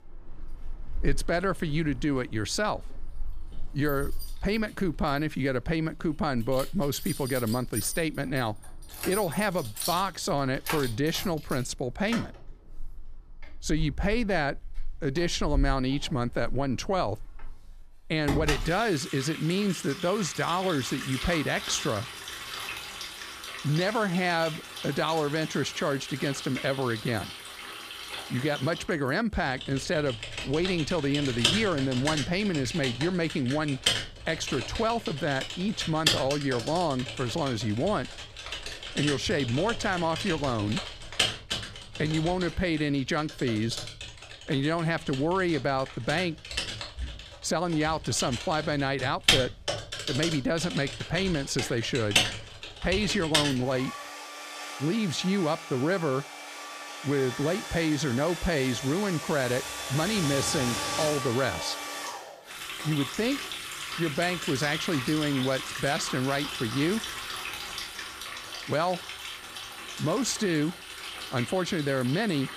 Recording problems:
household noises; loud; throughout; 5 dB below the speech

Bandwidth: 14.5 kHz